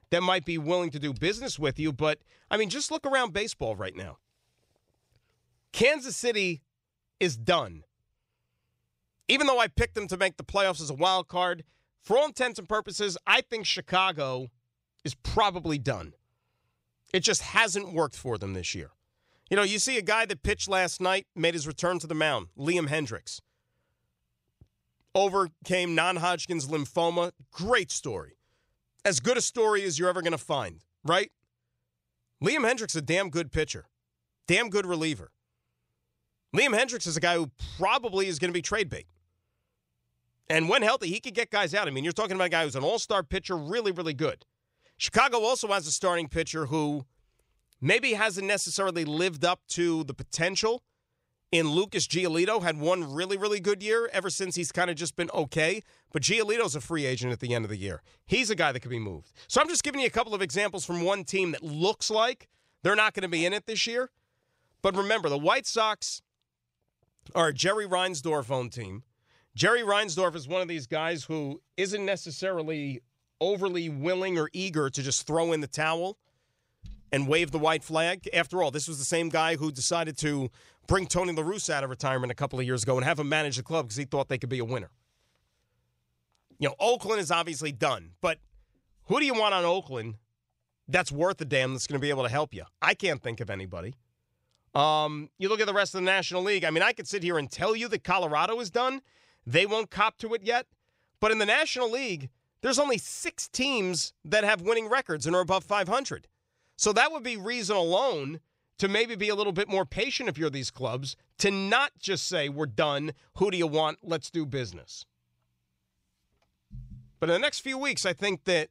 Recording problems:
none

